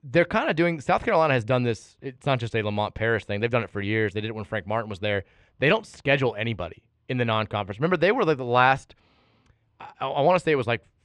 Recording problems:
muffled; very; fading above 3.5 kHz

